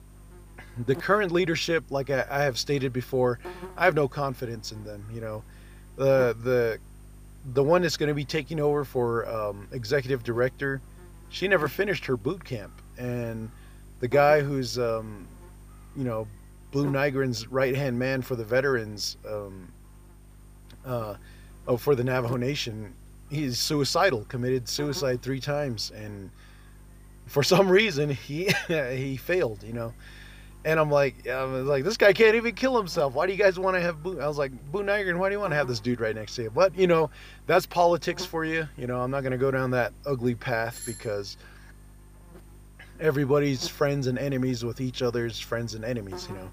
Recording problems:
electrical hum; faint; throughout; 50 Hz, 25 dB below the speech
doorbell; faint; at 41 s; peak 10 dB below the speech

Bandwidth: 15 kHz